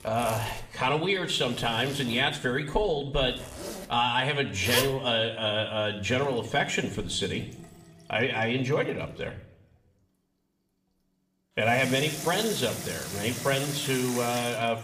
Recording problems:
room echo; slight; dies away in 0.6 s
off-mic speech; somewhat distant
household noises; loud; throughout; 8 dB below the speech

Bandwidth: 15 kHz